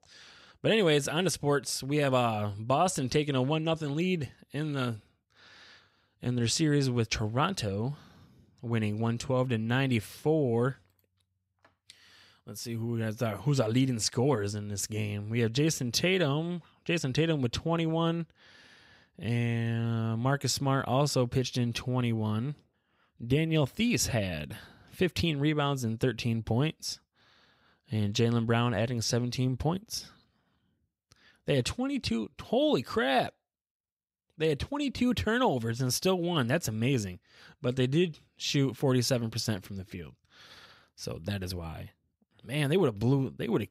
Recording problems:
none

